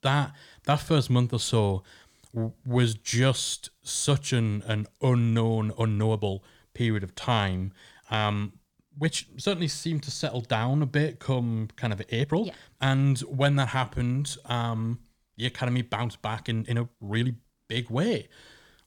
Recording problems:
uneven, jittery; strongly; from 2.5 to 17 s

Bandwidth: 18.5 kHz